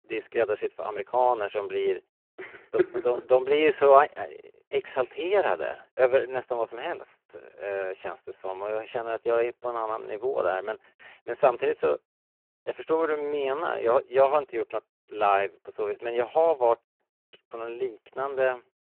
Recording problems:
phone-call audio; poor line

